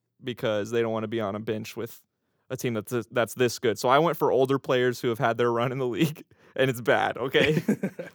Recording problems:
none

